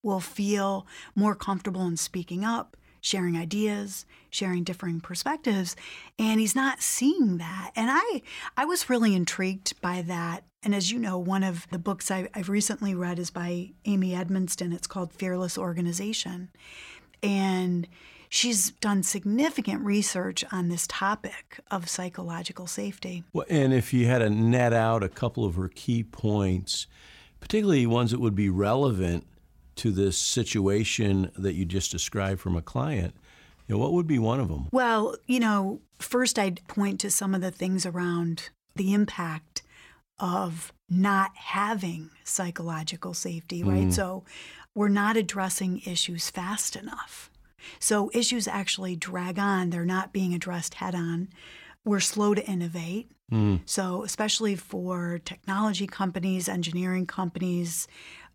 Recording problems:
none

